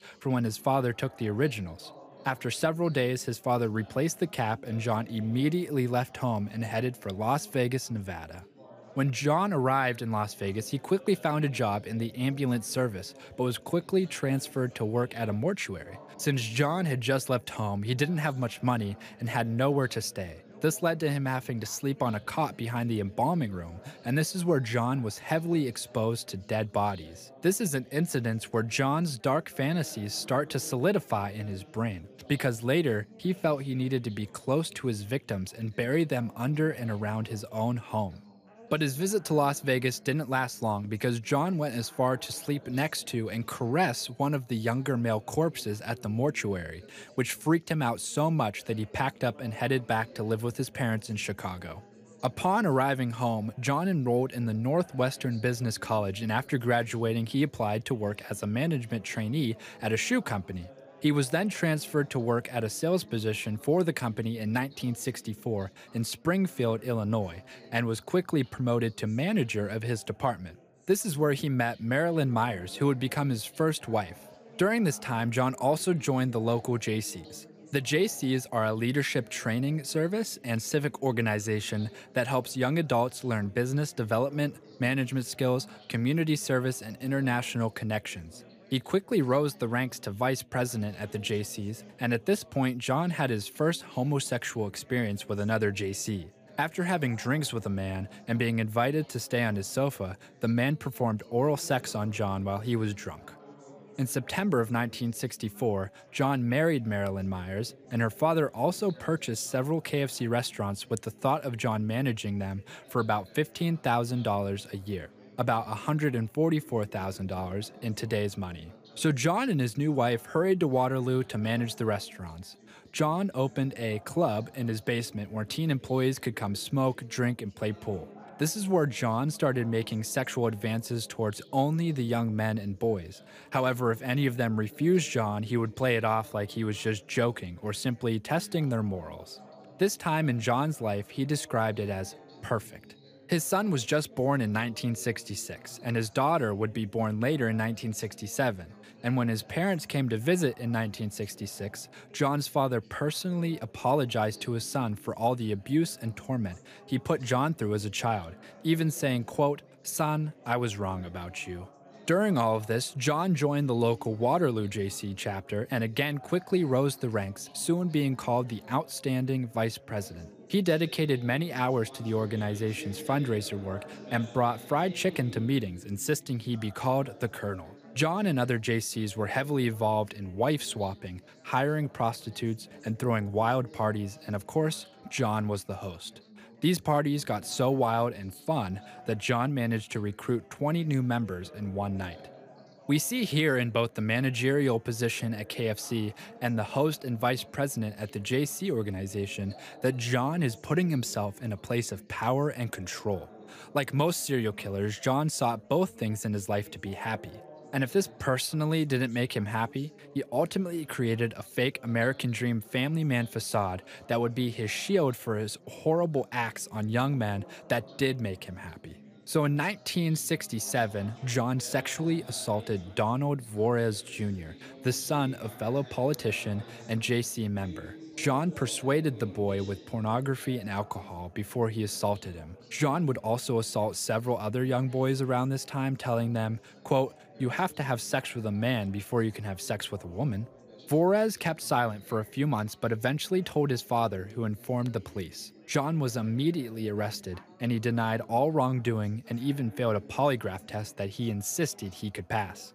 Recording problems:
chatter from many people; faint; throughout; 20 dB below the speech

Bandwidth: 15 kHz